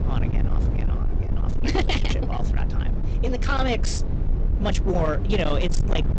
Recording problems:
high frequencies cut off; noticeable; nothing above 8 kHz
distortion; slight; 24% of the sound clipped
low rumble; loud; throughout; 9 dB below the speech
uneven, jittery; strongly; from 1 to 5 s

